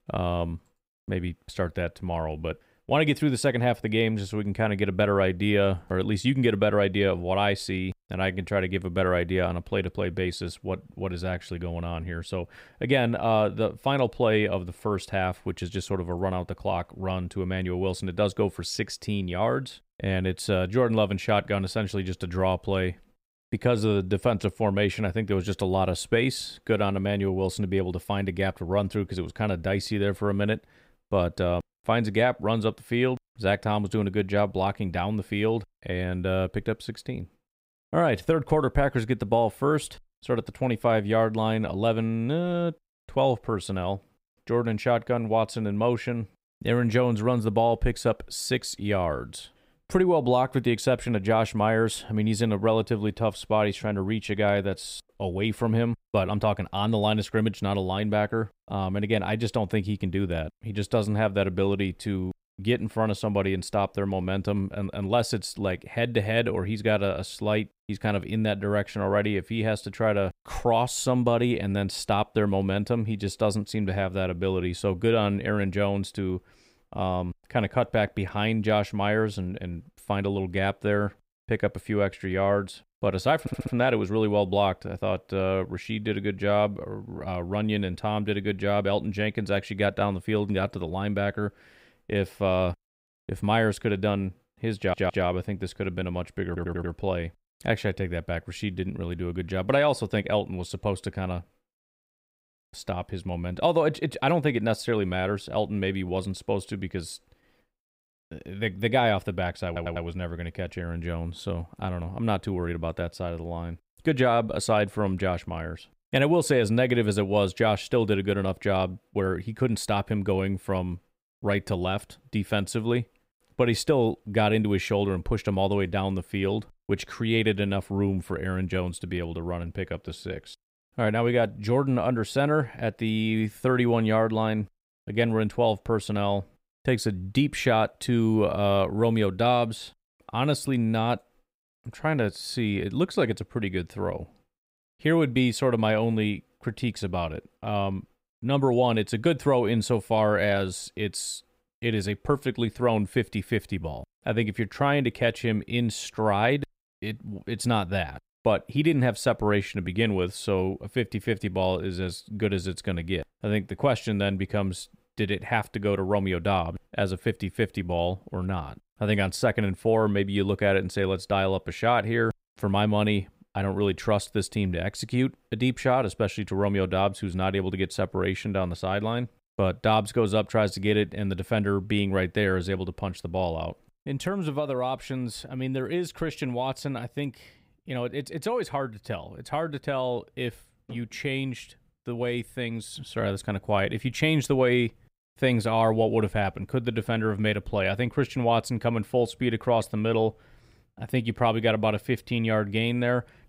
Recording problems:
audio stuttering; 4 times, first at 1:23

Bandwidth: 15.5 kHz